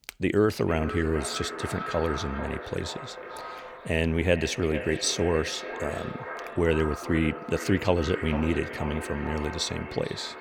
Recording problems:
echo of what is said; strong; throughout; 450 ms later, 9 dB below the speech

